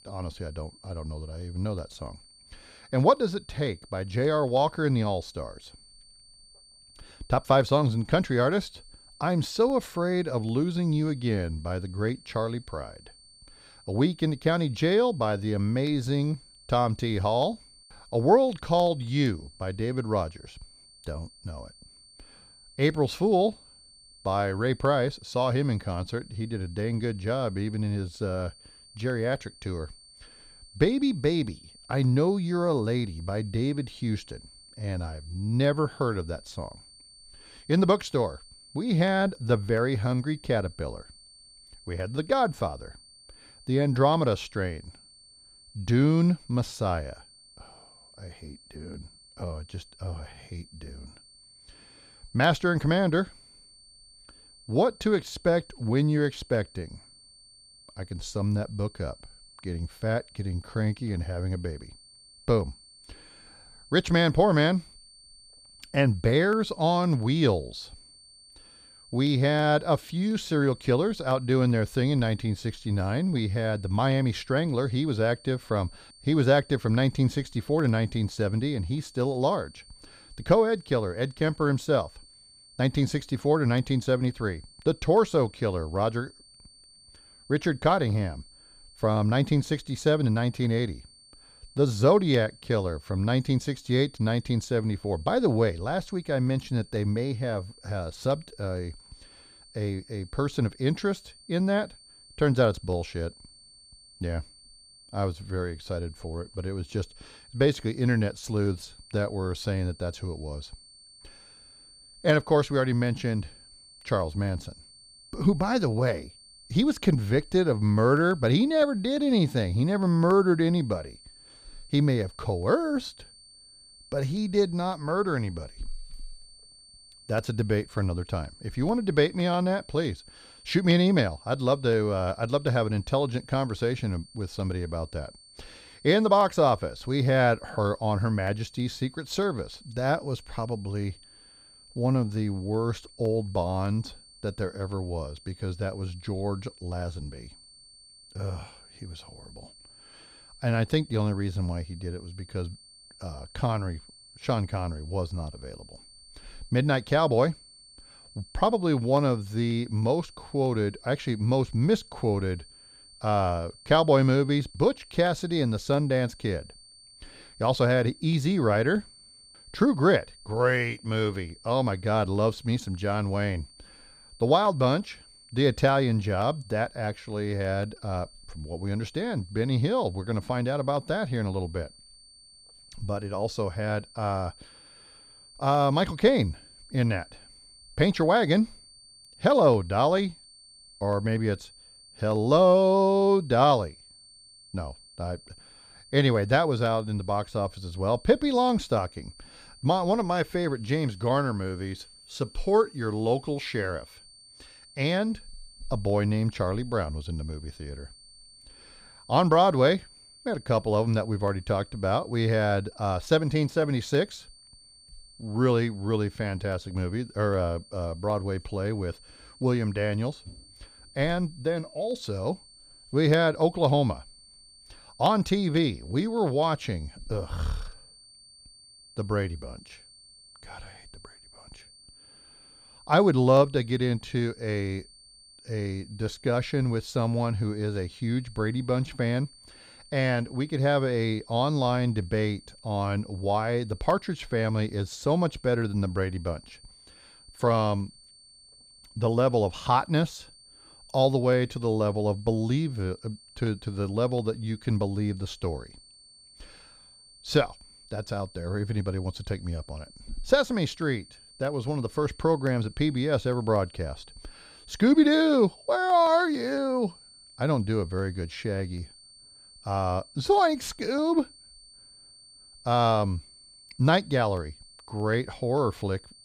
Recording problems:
high-pitched whine; faint; throughout; 4.5 kHz, 25 dB below the speech

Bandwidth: 15 kHz